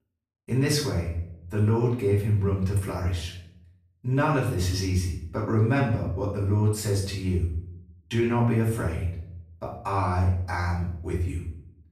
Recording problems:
off-mic speech; far
room echo; noticeable; dies away in 0.6 s

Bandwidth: 14.5 kHz